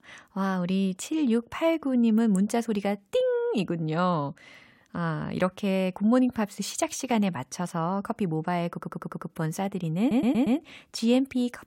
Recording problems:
audio stuttering; at 8.5 s and at 10 s

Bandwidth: 16 kHz